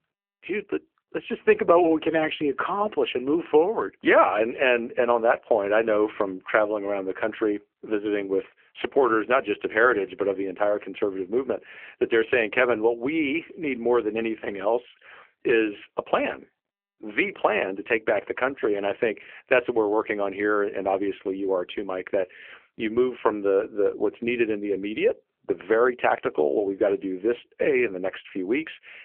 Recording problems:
phone-call audio; poor line

